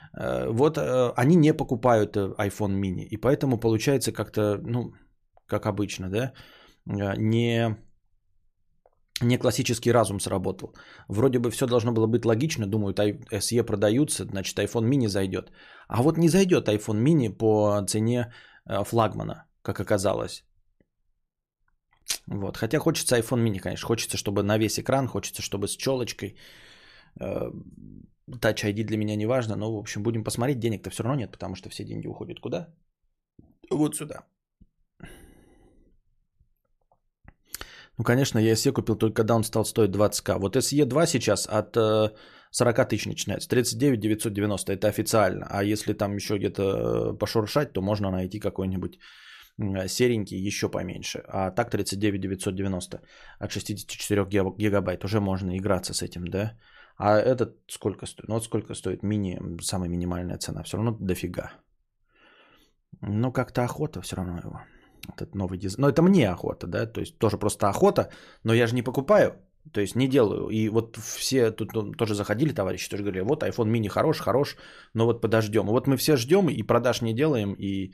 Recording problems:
none

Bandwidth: 14.5 kHz